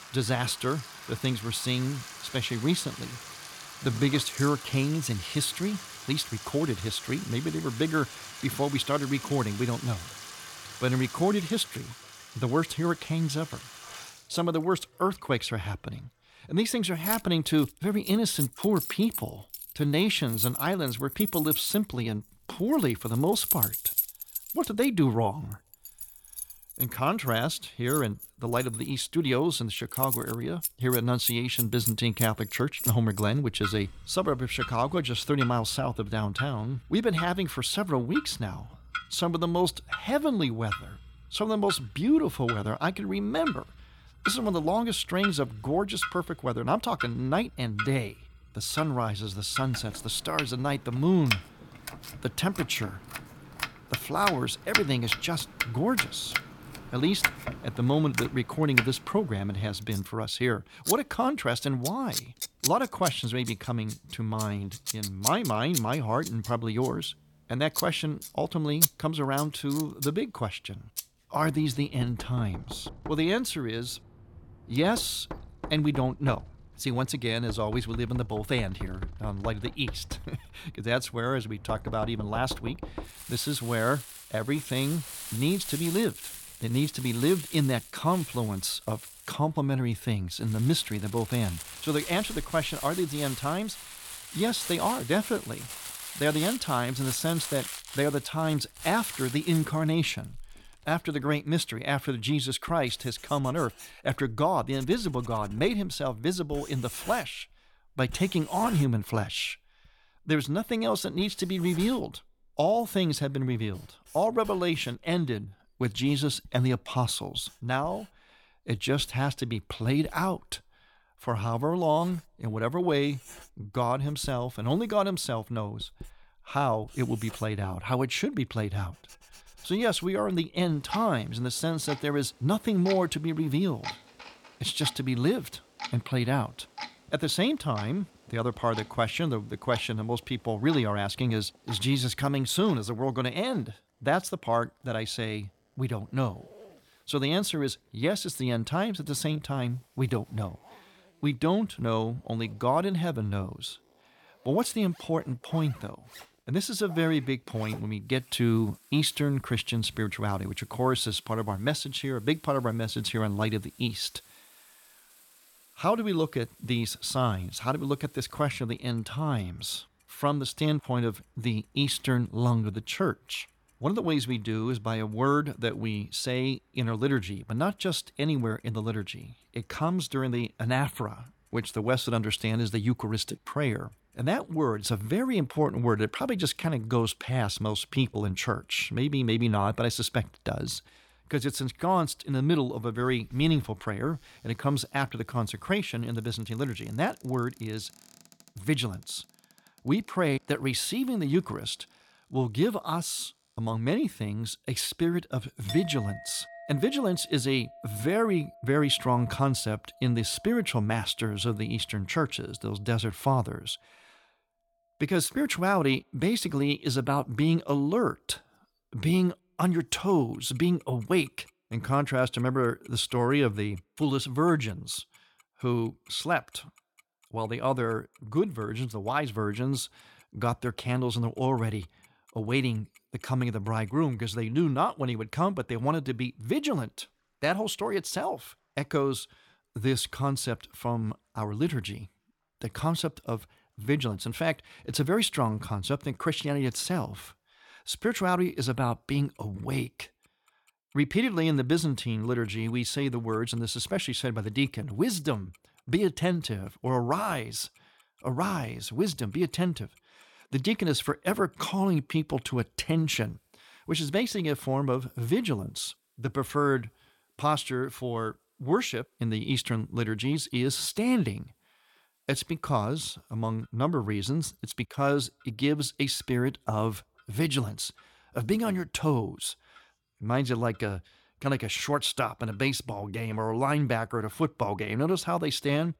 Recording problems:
household noises; loud; throughout; 7 dB below the speech

